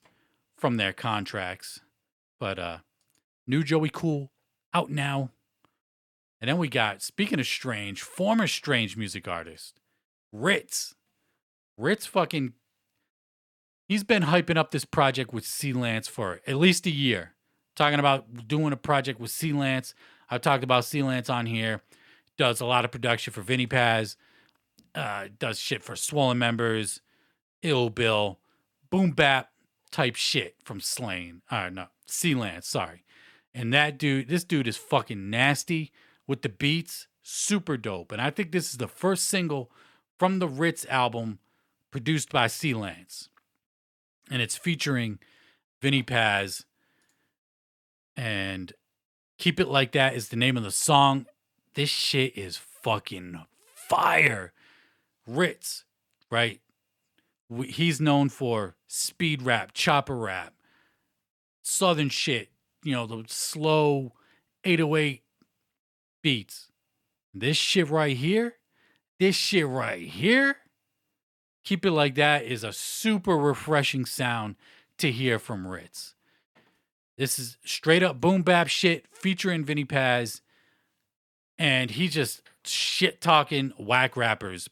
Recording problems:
none

